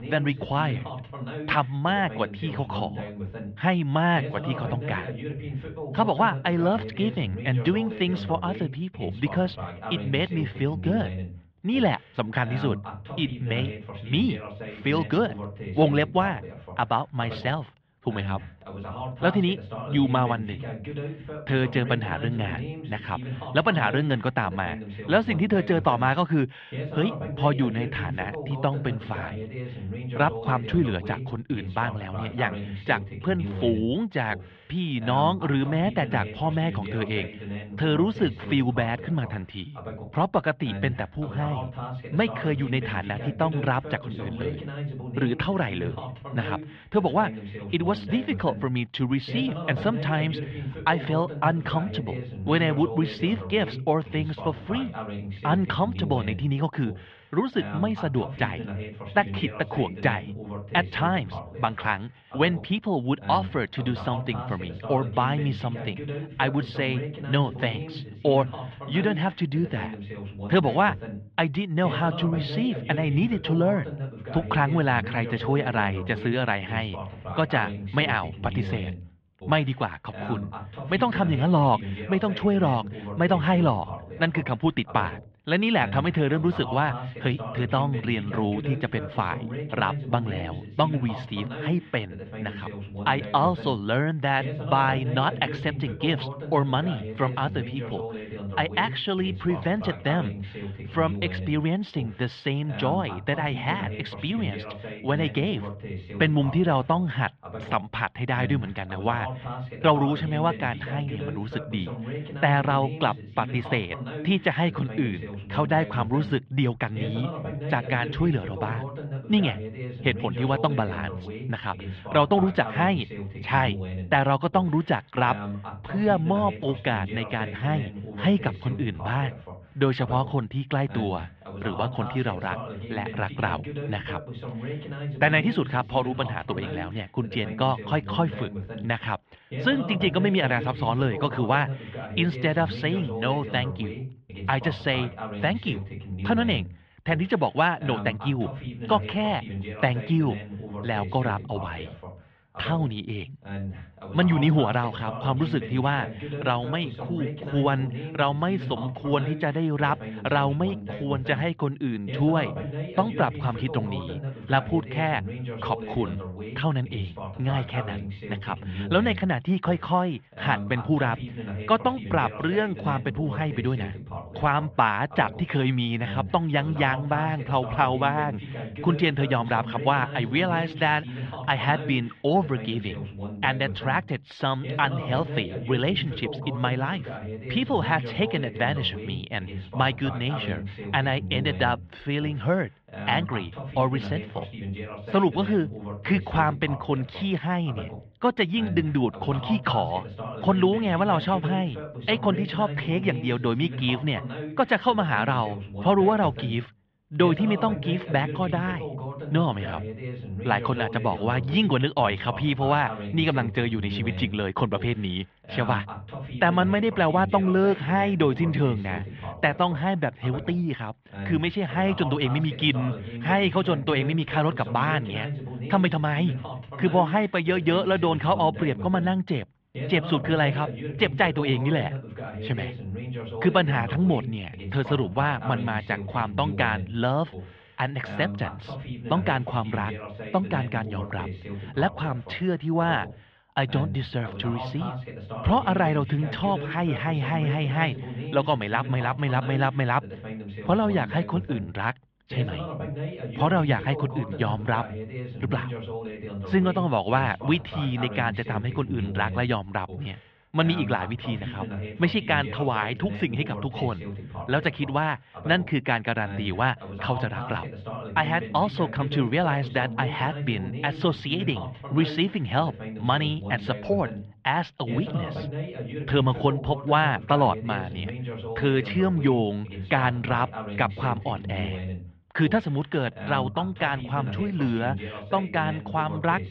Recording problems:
muffled; very; fading above 3.5 kHz
voice in the background; loud; throughout; 10 dB below the speech

